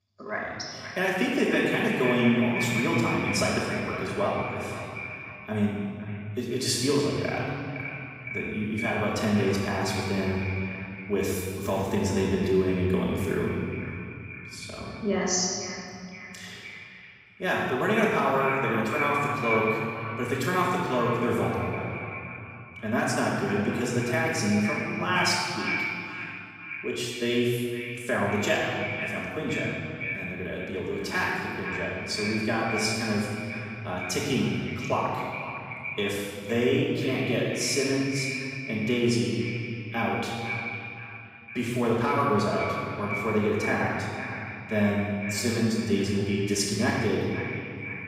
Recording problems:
echo of what is said; strong; throughout; 510 ms later, 8 dB below the speech
room echo; strong; dies away in 2.3 s
off-mic speech; far

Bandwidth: 15.5 kHz